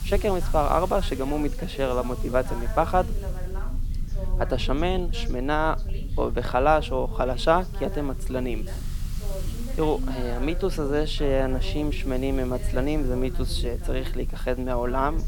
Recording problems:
voice in the background; noticeable; throughout; 15 dB below the speech
hiss; faint; throughout; 20 dB below the speech
low rumble; faint; throughout; 25 dB below the speech

